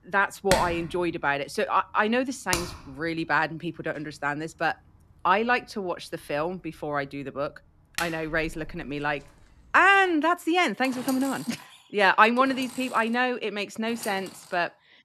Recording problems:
machinery noise; loud; throughout; 10 dB below the speech

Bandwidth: 13.5 kHz